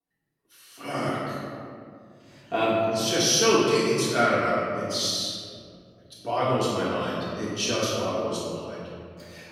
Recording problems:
room echo; strong; dies away in 2.3 s
off-mic speech; far

